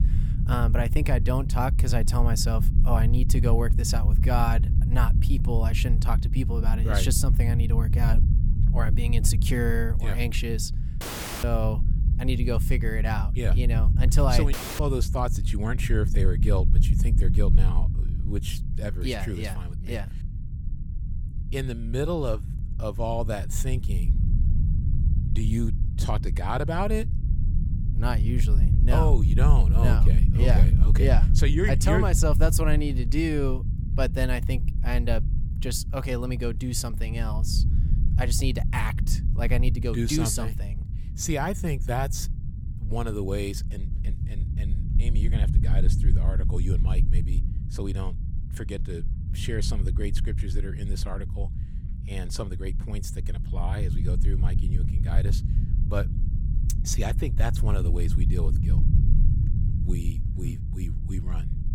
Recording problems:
low rumble; loud; throughout; 9 dB below the speech
audio cutting out; at 11 s and at 15 s

